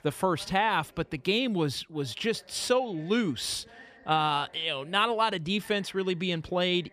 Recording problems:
background chatter; faint; throughout; 3 voices, 25 dB below the speech

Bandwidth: 14.5 kHz